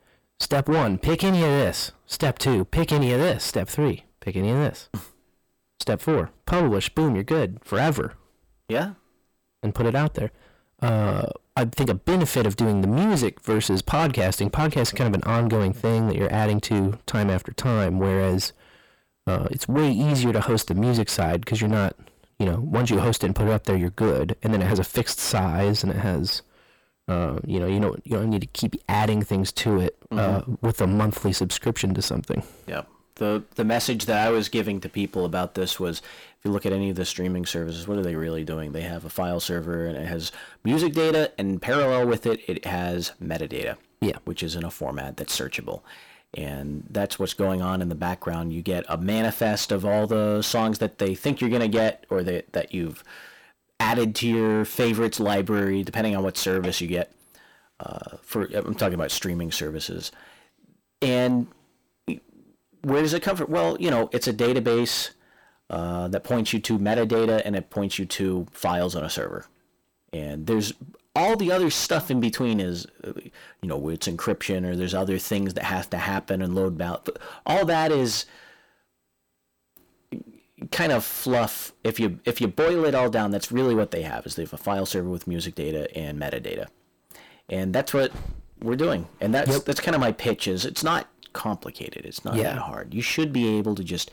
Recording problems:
distortion; heavy; 6 dB below the speech

